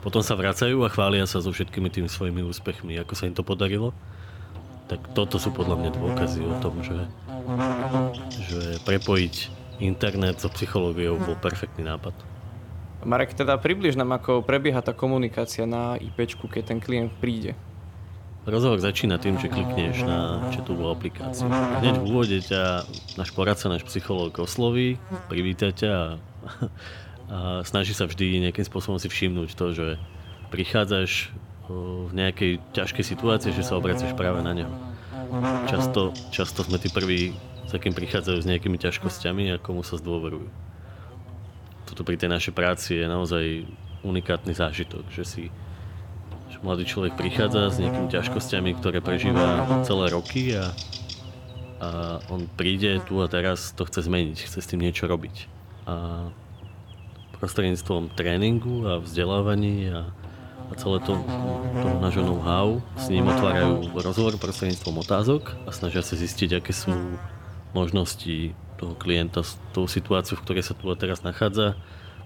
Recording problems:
electrical hum; loud; throughout; 50 Hz, 6 dB below the speech

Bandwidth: 17 kHz